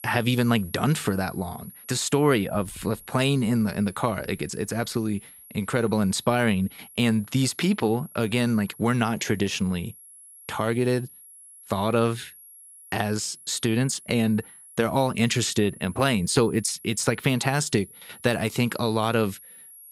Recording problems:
high-pitched whine; noticeable; throughout; 11.5 kHz, 20 dB below the speech

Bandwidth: 14.5 kHz